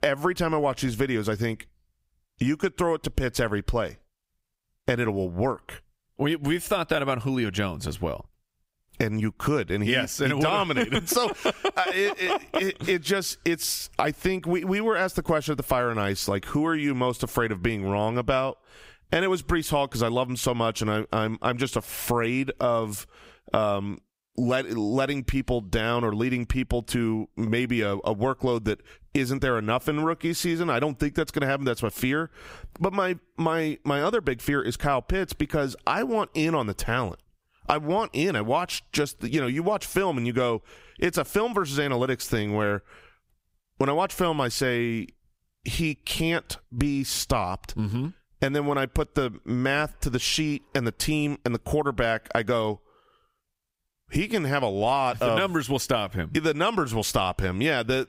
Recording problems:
squashed, flat; somewhat

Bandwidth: 15.5 kHz